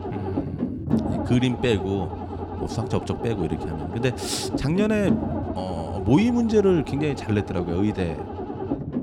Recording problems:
low rumble; loud; throughout; 6 dB below the speech

